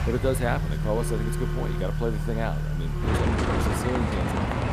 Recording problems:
traffic noise; very loud; throughout; 4 dB above the speech
phone ringing; noticeable; from 1 to 4 s; peak 7 dB below the speech

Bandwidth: 15 kHz